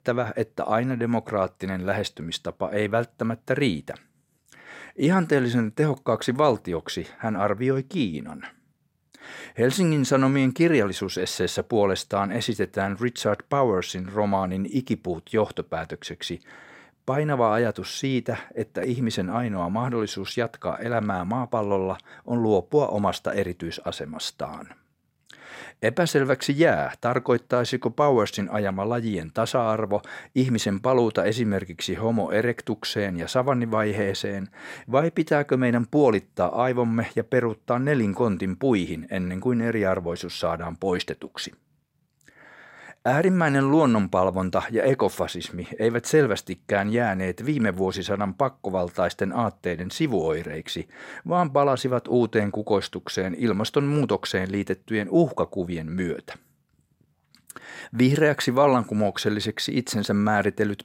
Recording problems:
none

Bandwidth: 16 kHz